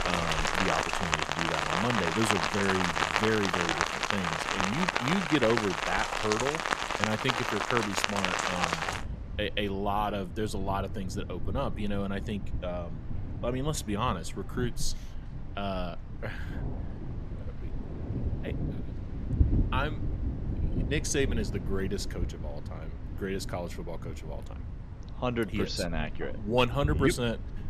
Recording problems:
rain or running water; loud; throughout; as loud as the speech

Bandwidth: 14.5 kHz